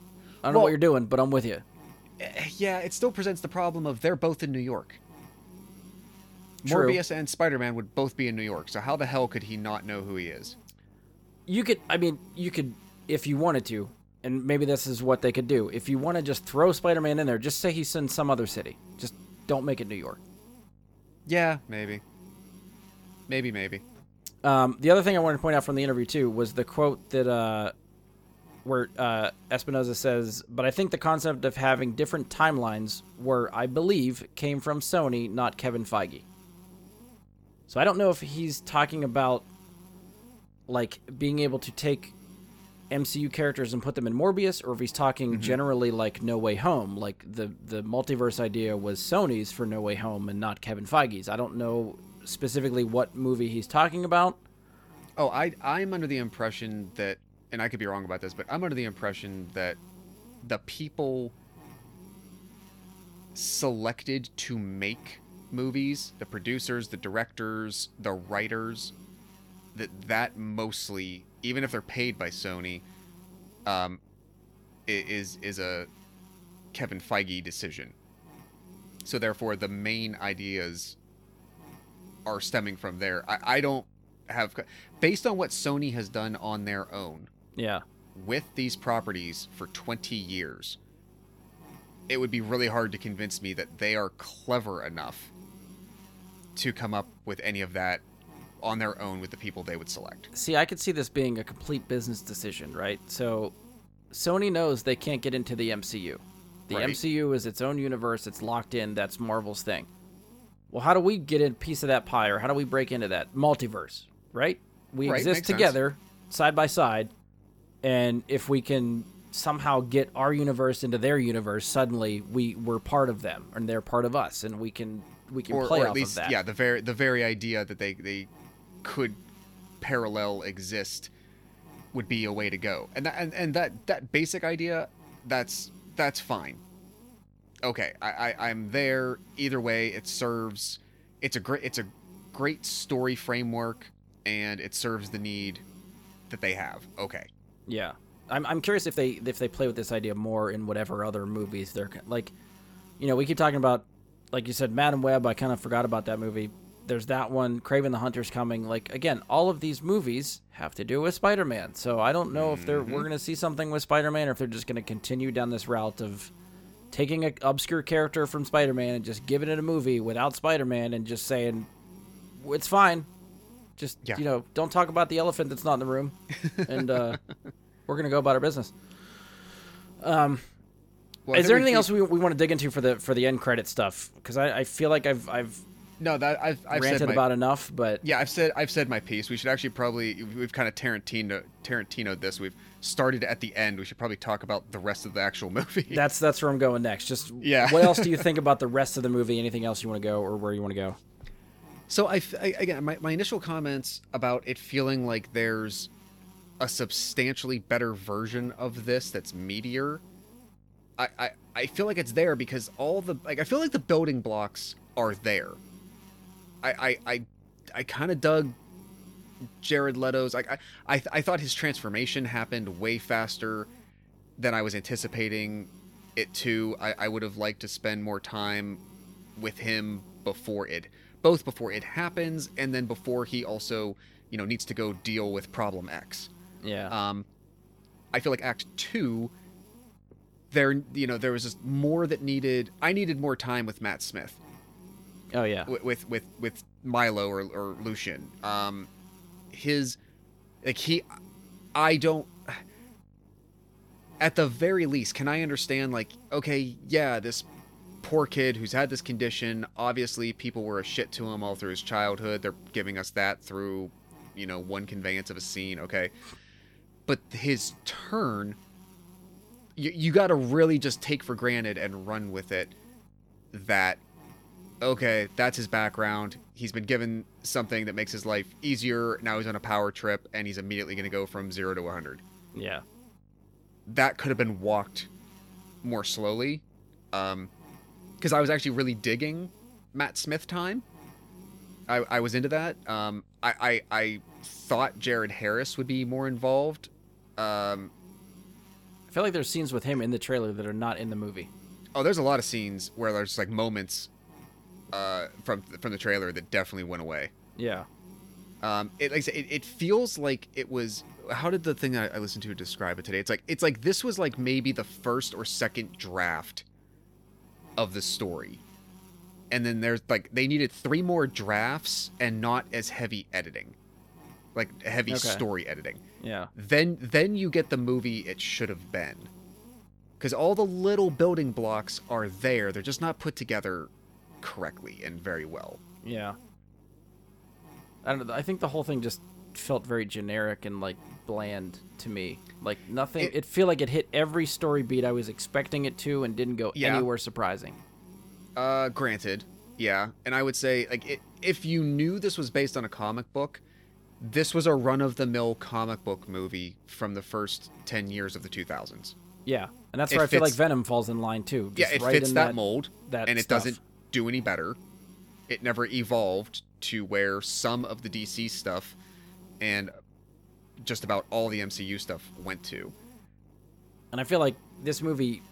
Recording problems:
electrical hum; faint; throughout; 50 Hz, 30 dB below the speech
uneven, jittery; strongly; from 29 s to 5:29

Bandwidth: 18 kHz